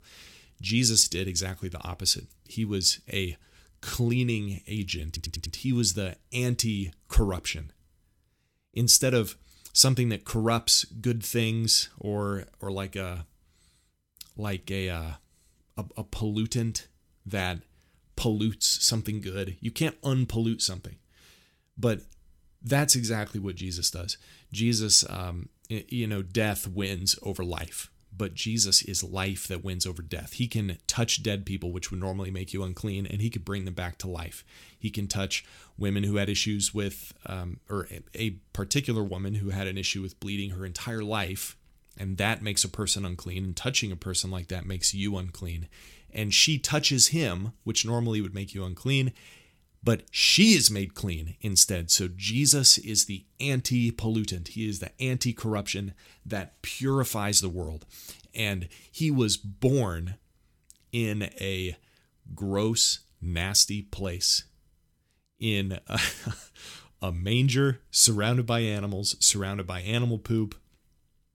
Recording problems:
audio stuttering; at 5 s

